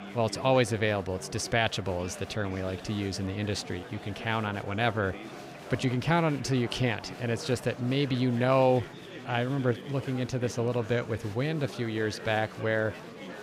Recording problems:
chatter from many people; noticeable; throughout; 15 dB below the speech

